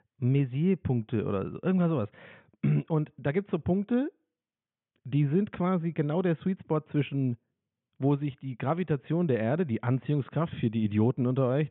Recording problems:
high frequencies cut off; severe; nothing above 3.5 kHz

